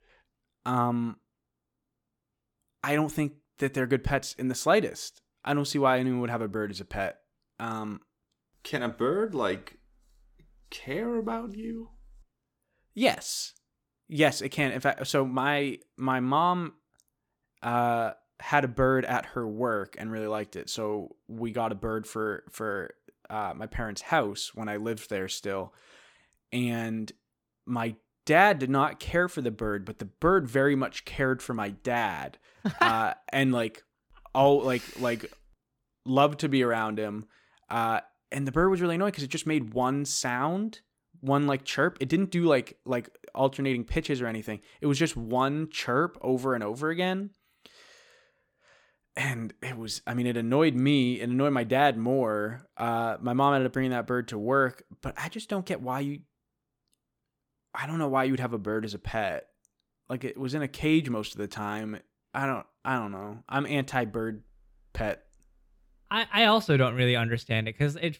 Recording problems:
none

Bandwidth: 17.5 kHz